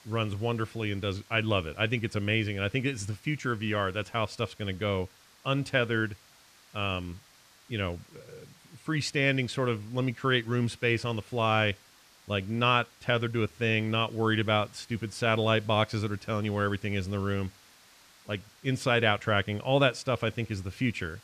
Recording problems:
muffled; slightly; fading above 3.5 kHz
hiss; faint; throughout; 25 dB below the speech

